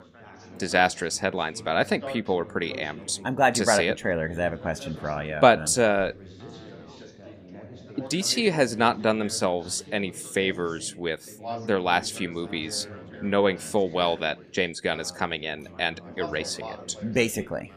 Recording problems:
background chatter; noticeable; throughout; 4 voices, 15 dB below the speech

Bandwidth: 15 kHz